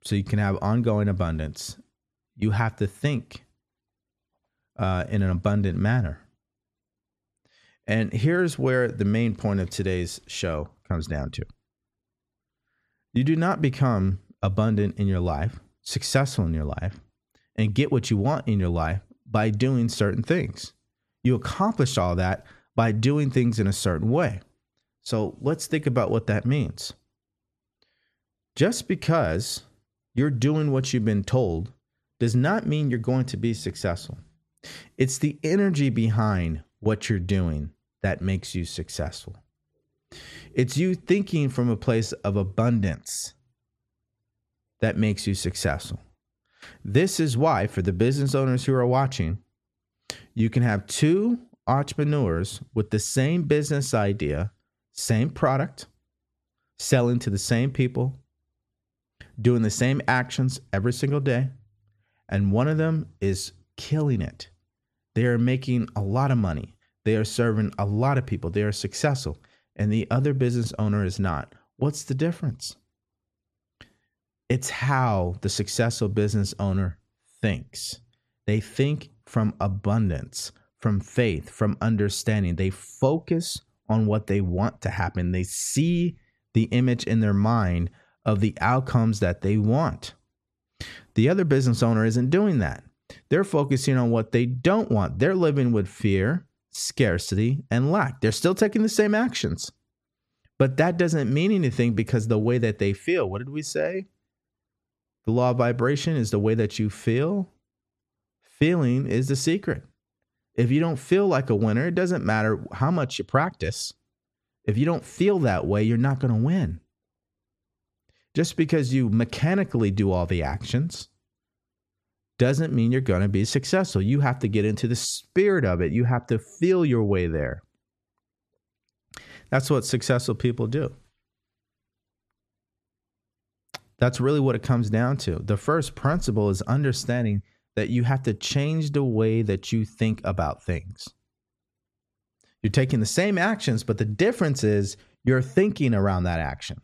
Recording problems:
none

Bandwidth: 13.5 kHz